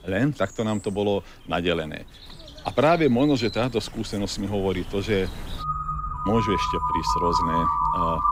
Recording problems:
animal sounds; loud; throughout; 1 dB below the speech

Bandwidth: 15.5 kHz